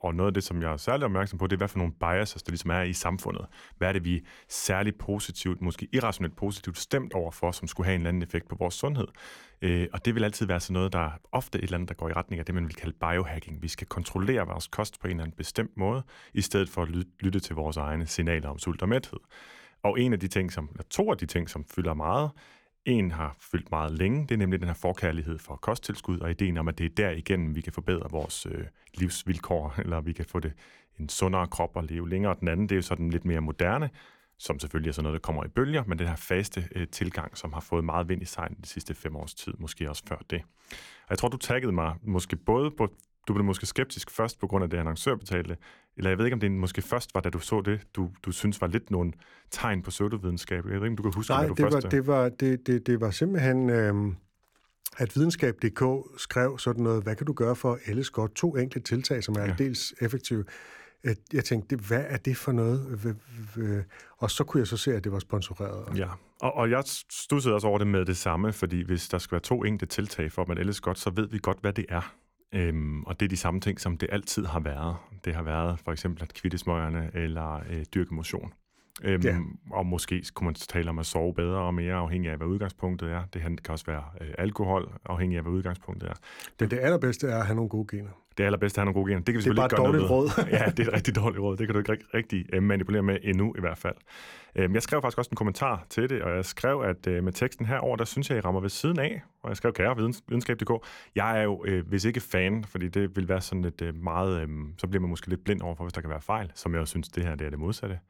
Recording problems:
none

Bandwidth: 17 kHz